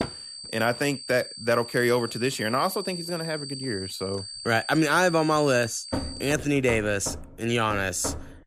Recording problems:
high-pitched whine; noticeable; until 6.5 s; 4.5 kHz, 10 dB below the speech
door banging; noticeable; at the start and from 6 s on; peak 7 dB below the speech

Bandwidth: 14.5 kHz